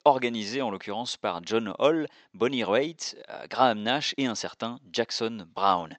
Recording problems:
thin; very; fading below 500 Hz
high frequencies cut off; noticeable; nothing above 8 kHz

